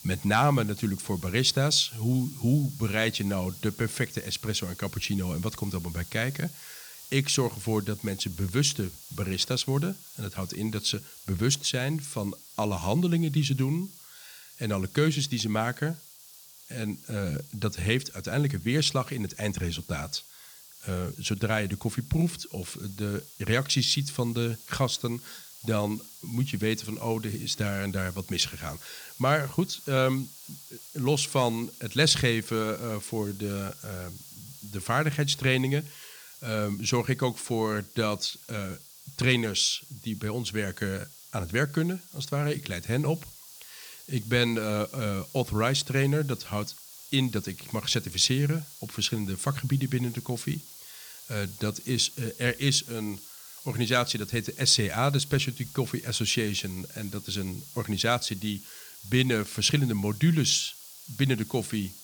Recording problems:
hiss; noticeable; throughout; 15 dB below the speech

